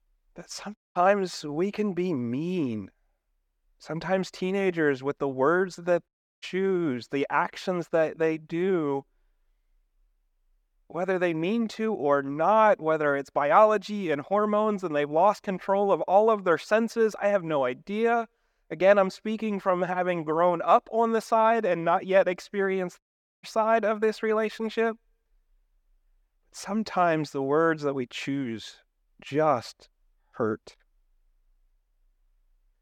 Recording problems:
audio cutting out; at 1 s, at 6 s and at 23 s

